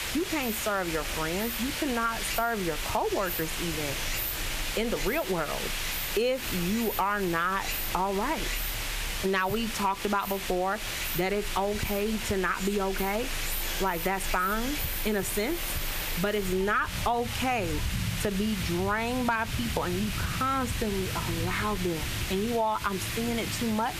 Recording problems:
squashed, flat; heavily
rain or running water; loud; throughout; 7 dB below the speech
hiss; loud; throughout; 5 dB below the speech

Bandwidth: 14.5 kHz